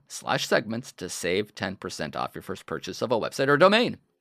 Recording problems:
none

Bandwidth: 14.5 kHz